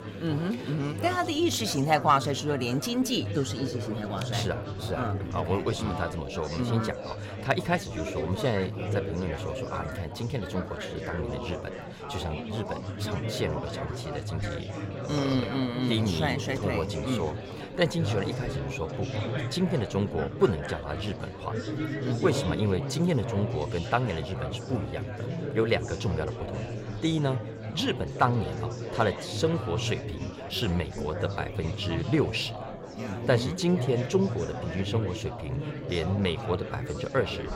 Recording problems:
chatter from many people; loud; throughout; 5 dB below the speech

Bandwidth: 16 kHz